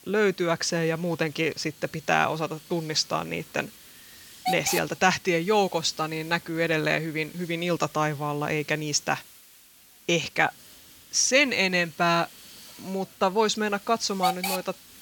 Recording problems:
hiss; noticeable; throughout; 15 dB below the speech

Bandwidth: 18 kHz